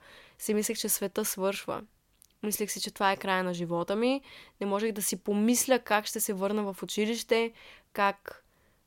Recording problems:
none

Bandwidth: 16.5 kHz